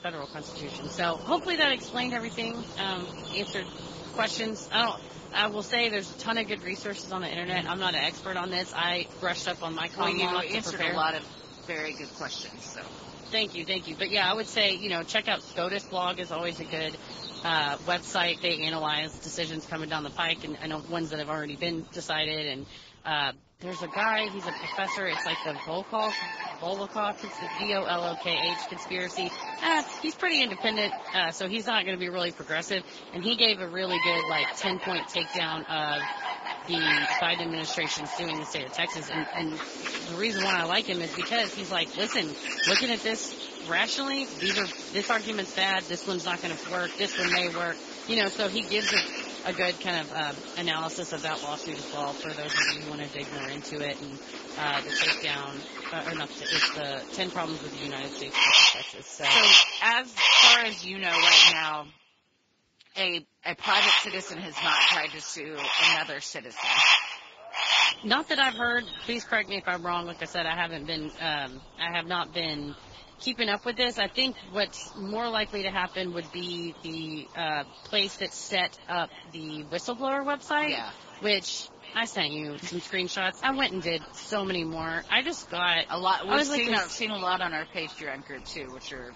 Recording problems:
garbled, watery; badly; nothing above 7.5 kHz
echo of what is said; faint; from 1:04 on; 560 ms later, 20 dB below the speech
animal sounds; very loud; throughout; 4 dB above the speech

